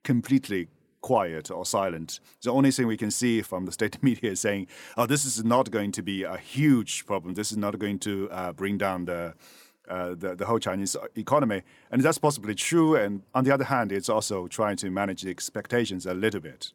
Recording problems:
none

